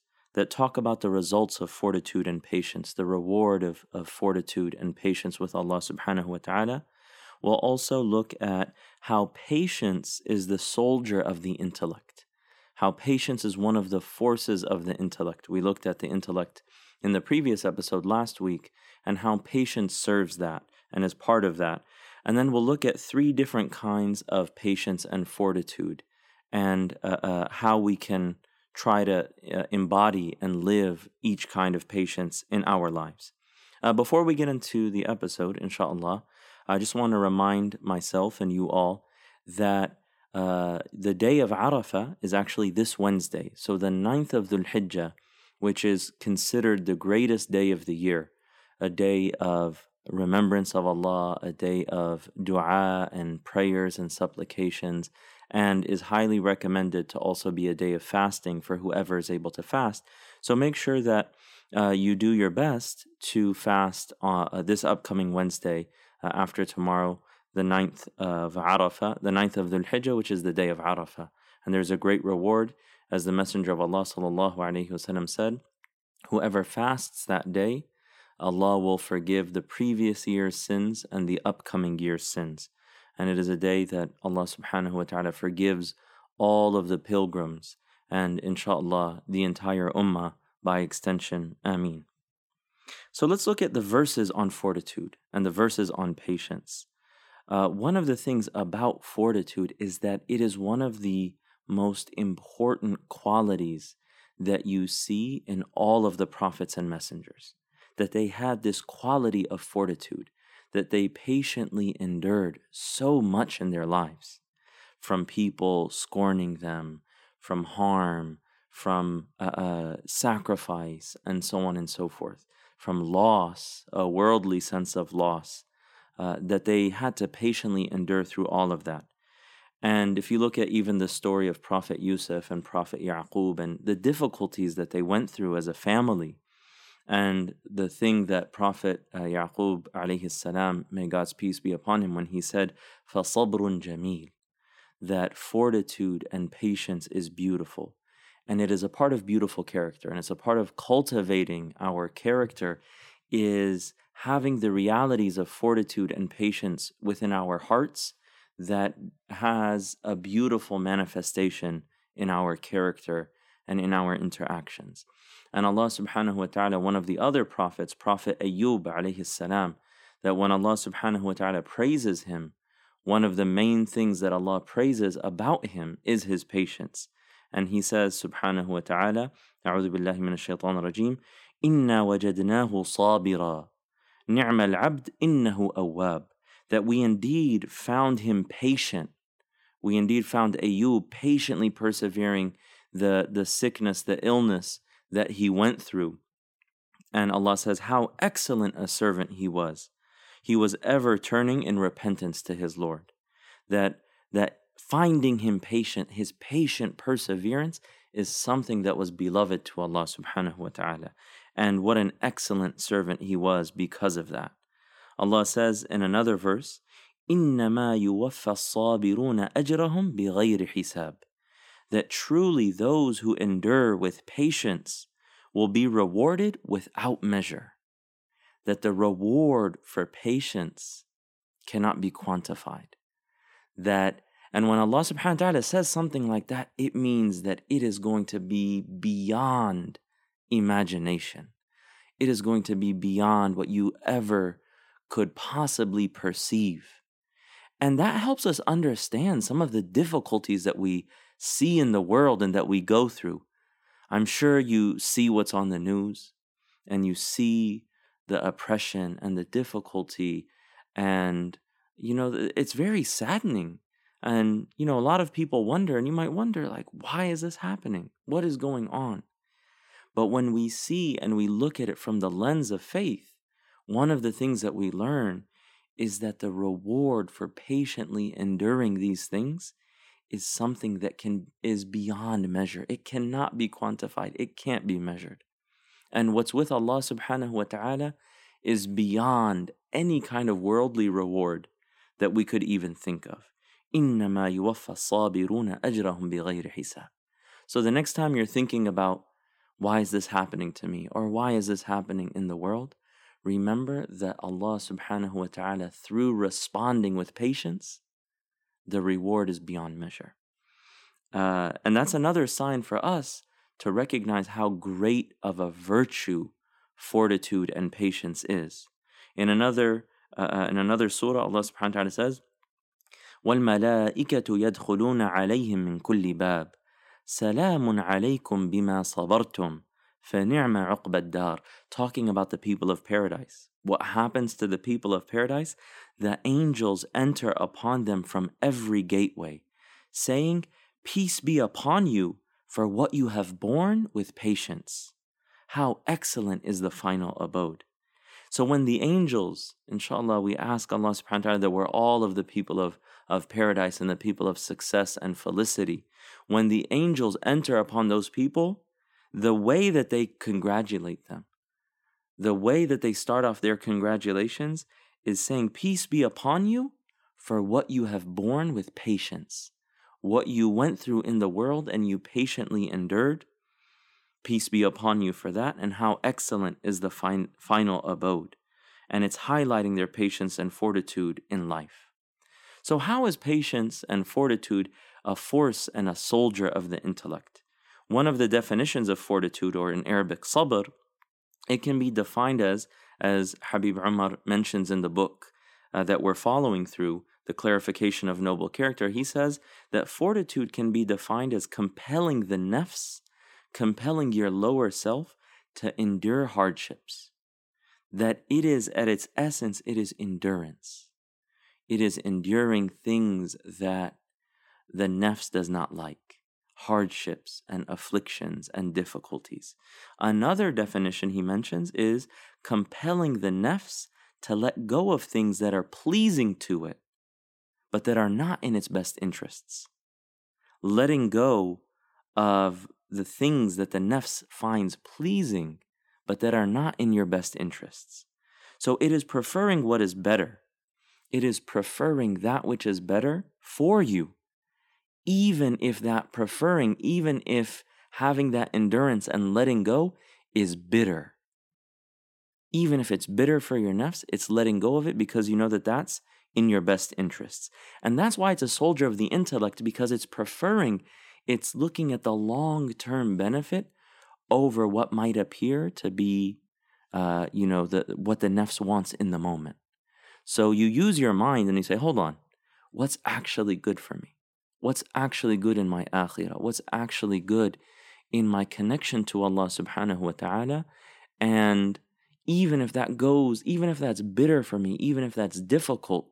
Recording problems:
none

